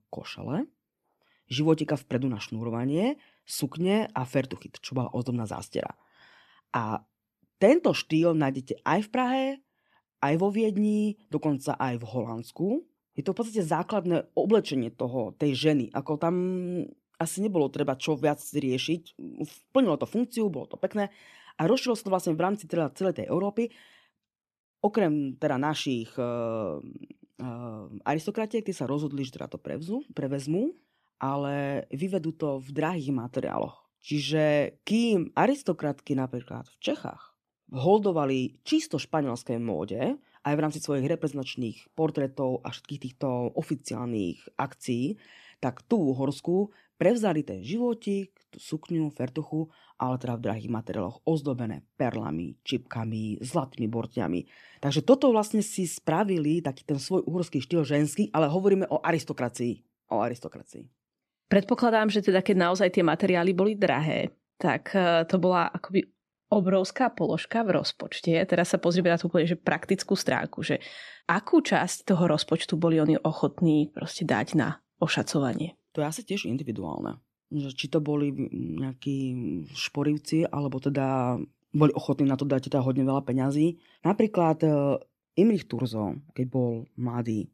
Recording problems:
none

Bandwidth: 13.5 kHz